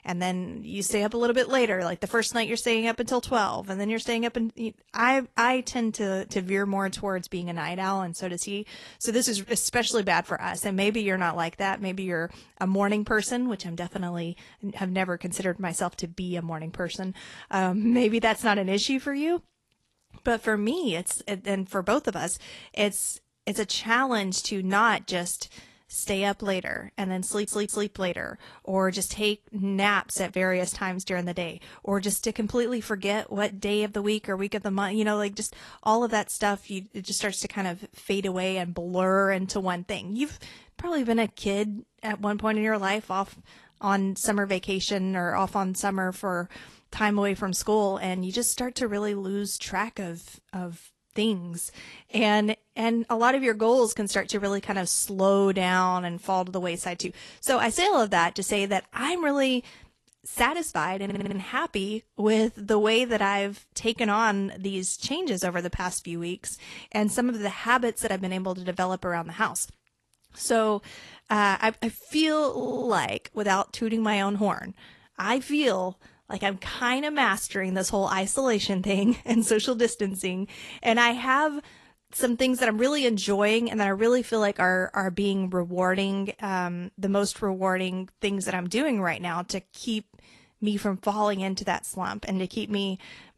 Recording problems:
garbled, watery; slightly; nothing above 11.5 kHz
audio stuttering; at 27 s, at 1:01 and at 1:13

